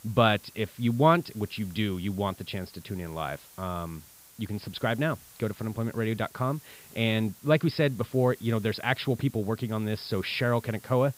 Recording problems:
high frequencies cut off; noticeable; nothing above 5.5 kHz
hiss; faint; throughout; 20 dB below the speech

